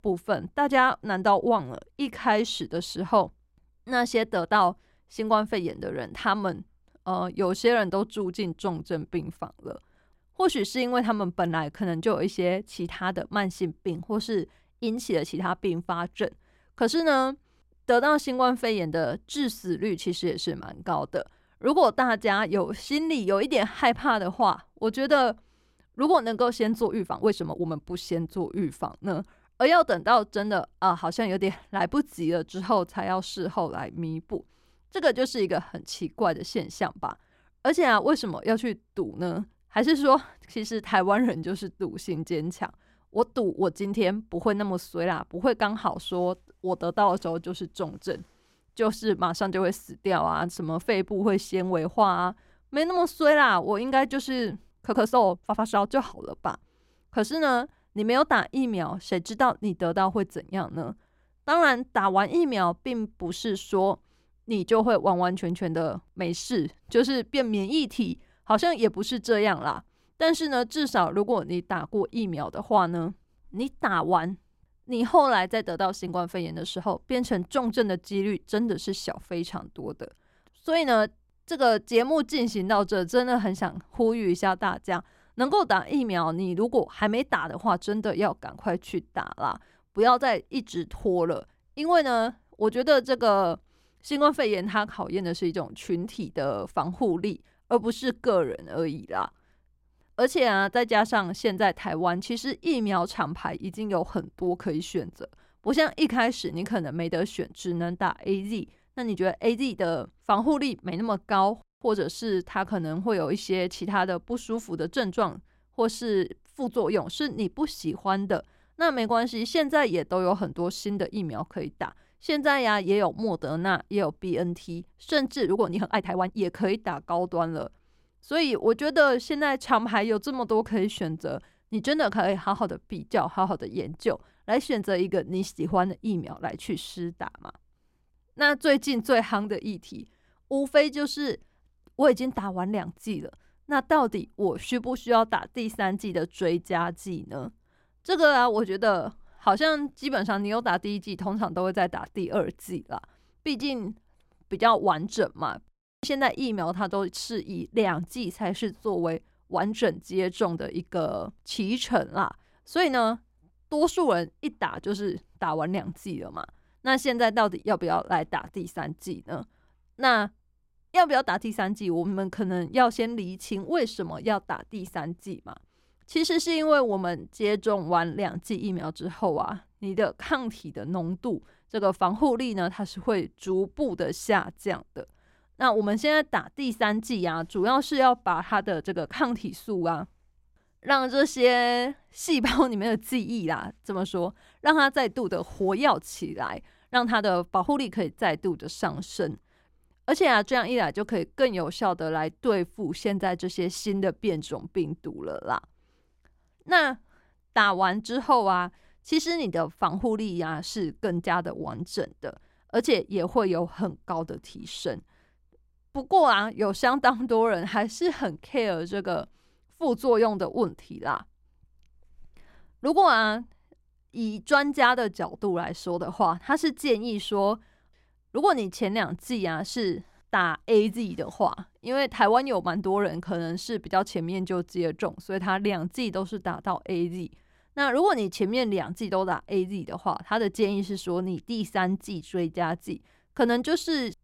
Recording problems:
uneven, jittery; strongly; from 27 s to 3:18

